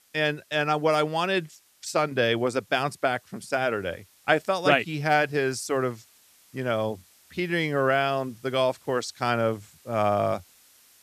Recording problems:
hiss; faint; throughout; 30 dB below the speech

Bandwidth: 14.5 kHz